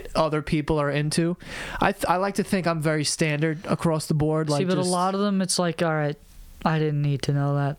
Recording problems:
squashed, flat; somewhat

